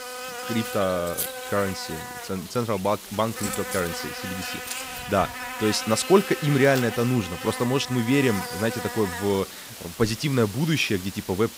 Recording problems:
electrical hum; loud; throughout; 50 Hz, 7 dB below the speech

